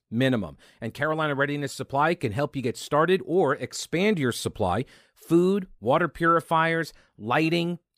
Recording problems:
none

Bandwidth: 15 kHz